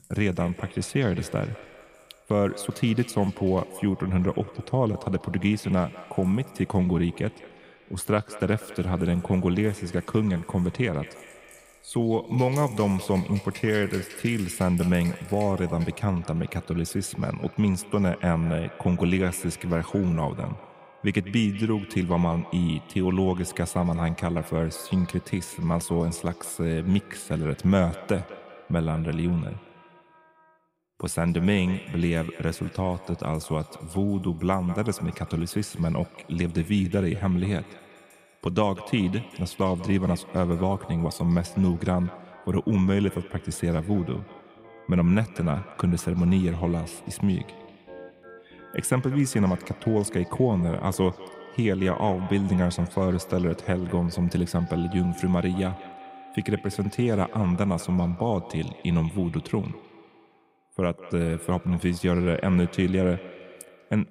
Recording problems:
echo of what is said; faint; throughout; 200 ms later, 20 dB below the speech
background music; faint; throughout; 25 dB below the speech

